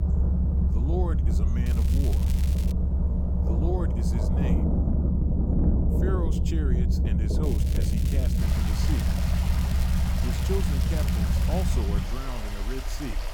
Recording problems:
rain or running water; very loud; throughout; as loud as the speech
low rumble; loud; throughout; 1 dB below the speech
crackling; loud; from 1.5 to 2.5 s and from 7.5 to 12 s; 7 dB below the speech

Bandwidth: 17 kHz